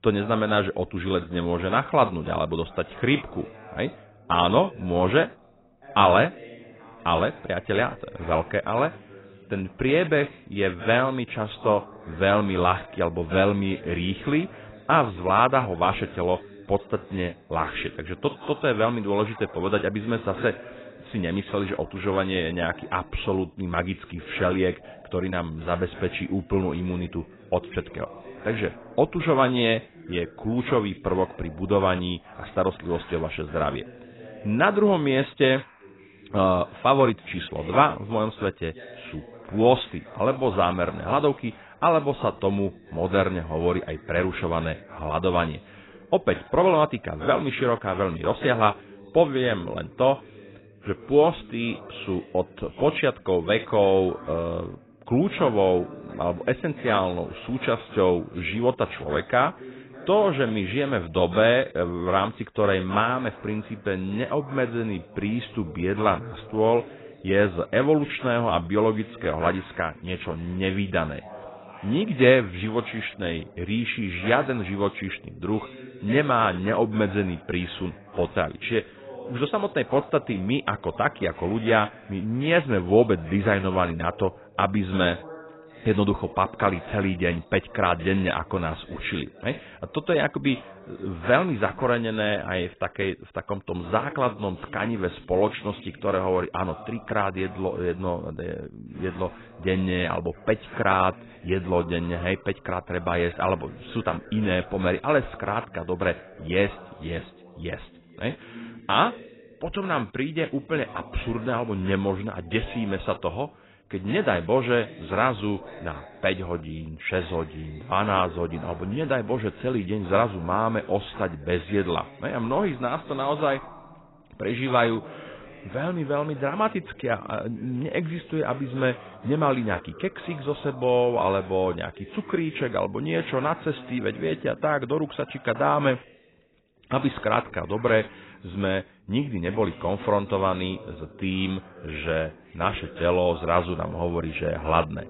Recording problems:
garbled, watery; badly; nothing above 4 kHz
voice in the background; faint; throughout; 20 dB below the speech

